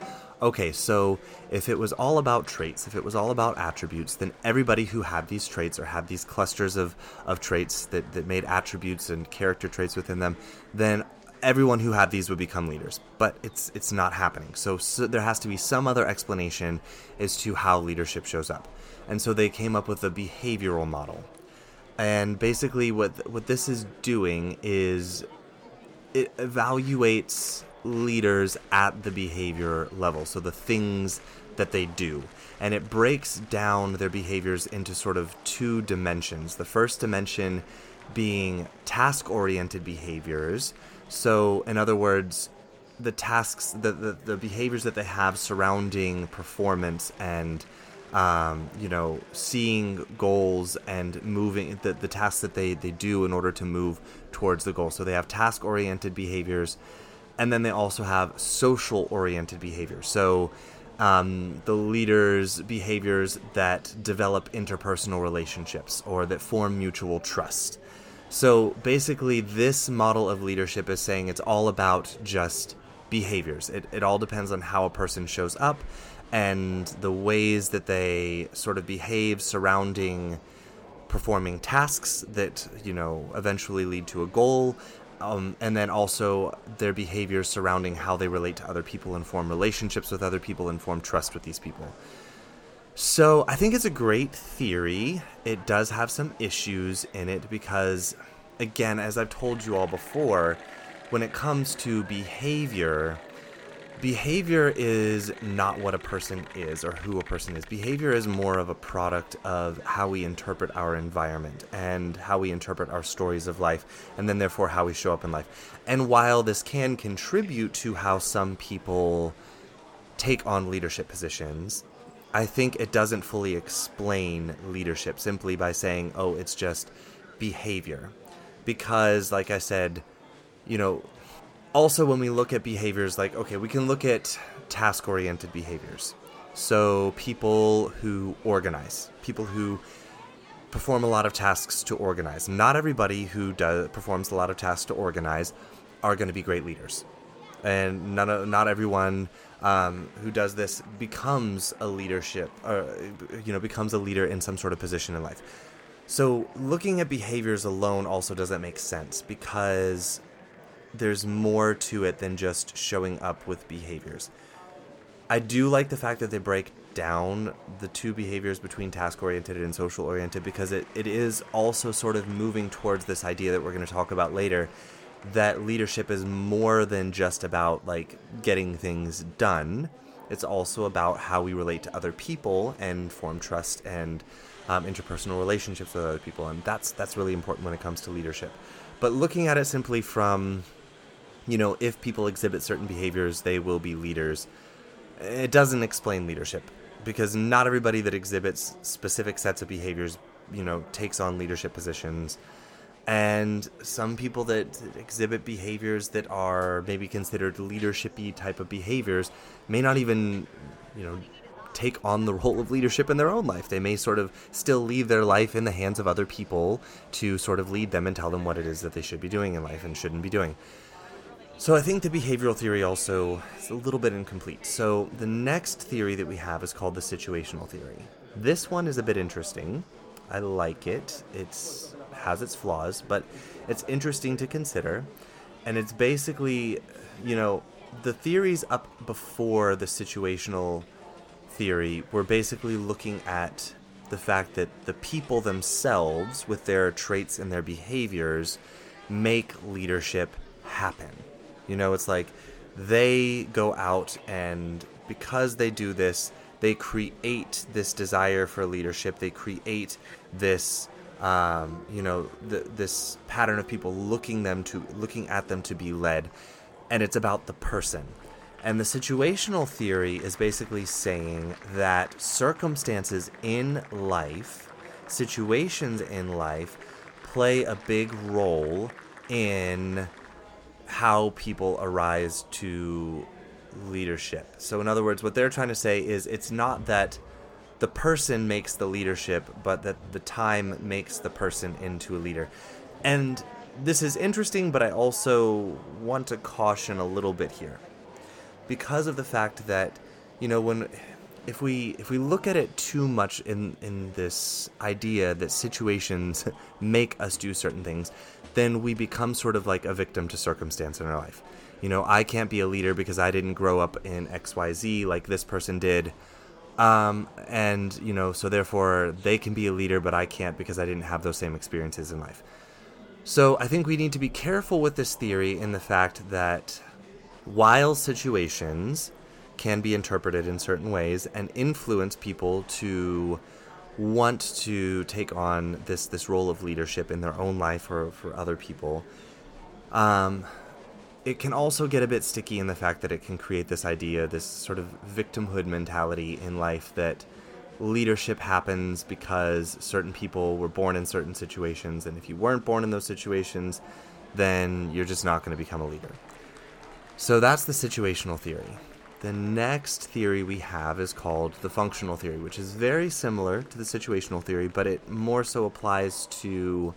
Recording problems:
murmuring crowd; faint; throughout; 20 dB below the speech

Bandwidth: 17.5 kHz